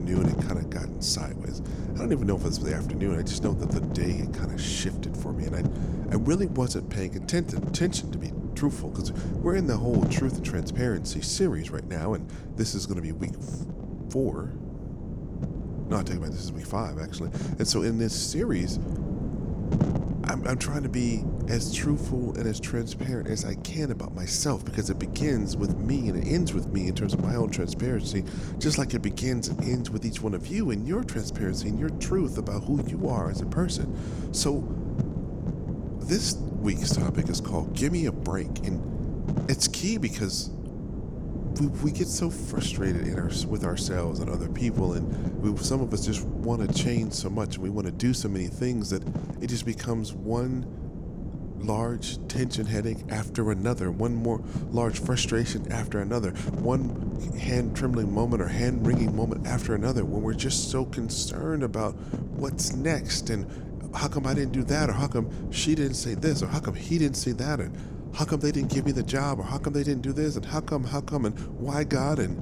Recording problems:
wind noise on the microphone; heavy; 8 dB below the speech
abrupt cut into speech; at the start

